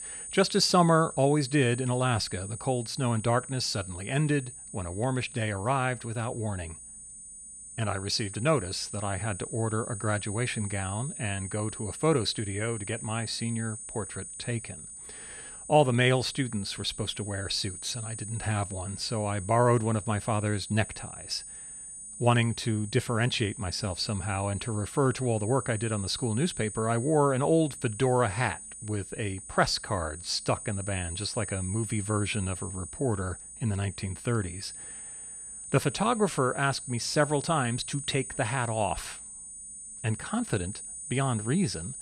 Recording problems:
high-pitched whine; loud; throughout; 9 kHz, 10 dB below the speech

